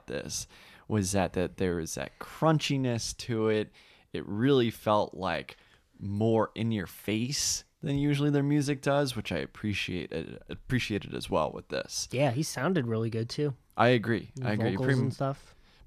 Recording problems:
none

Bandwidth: 14.5 kHz